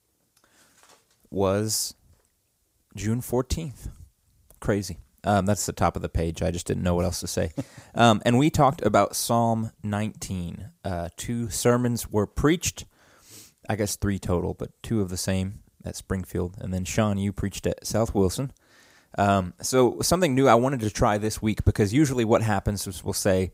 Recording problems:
none

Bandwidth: 15.5 kHz